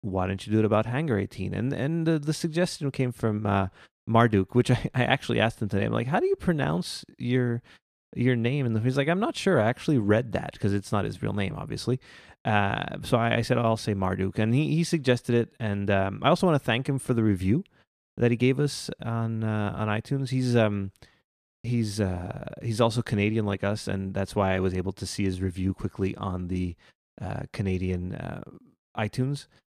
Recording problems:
none

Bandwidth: 14.5 kHz